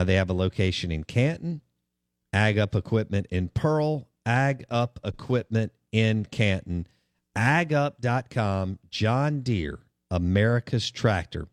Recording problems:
abrupt cut into speech; at the start

